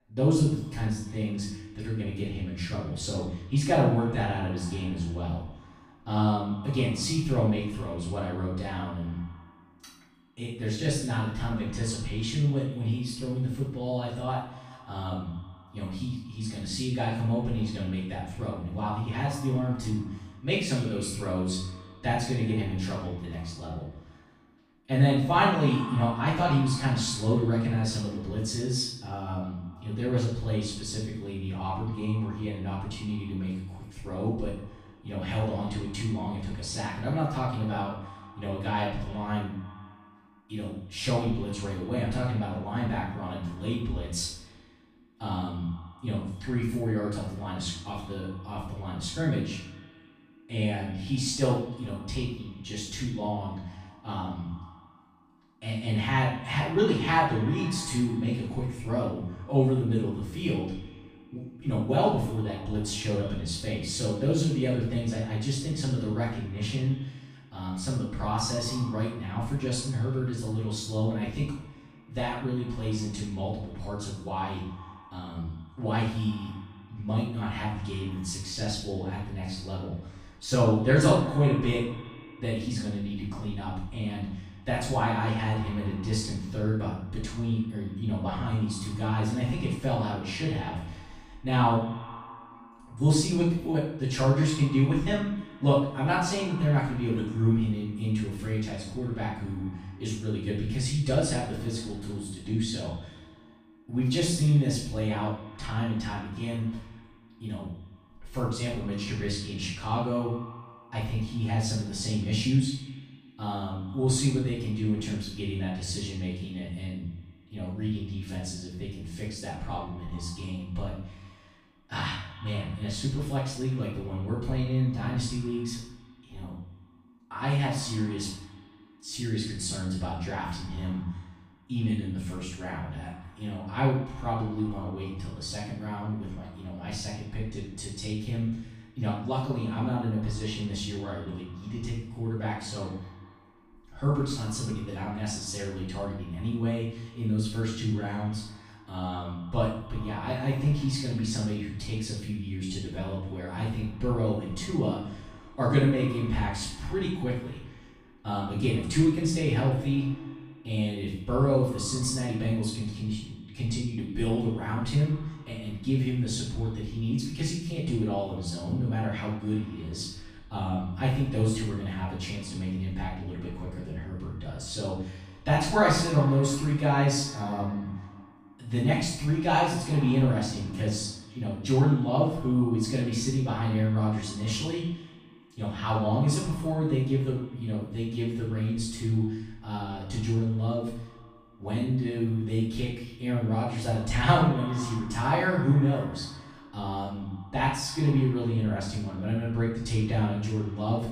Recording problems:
off-mic speech; far
room echo; noticeable; dies away in 0.6 s
echo of what is said; faint; throughout; 90 ms later, 20 dB below the speech

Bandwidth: 14.5 kHz